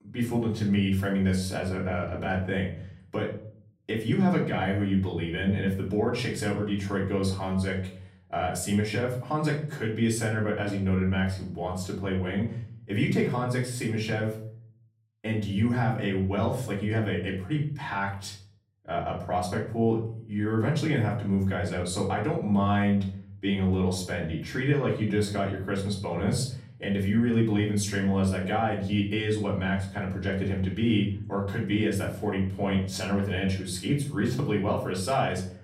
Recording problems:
off-mic speech; far
room echo; slight; dies away in 0.5 s

